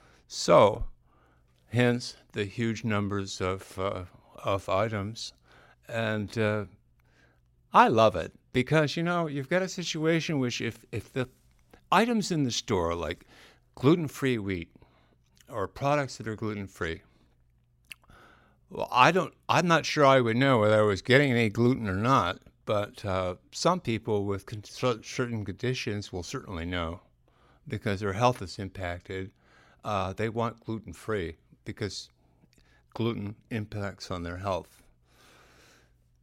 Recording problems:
none

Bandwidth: 16 kHz